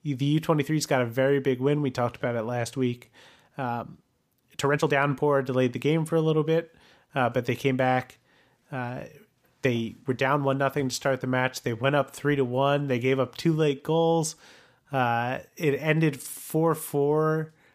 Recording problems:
uneven, jittery; strongly; from 2 to 16 s

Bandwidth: 15 kHz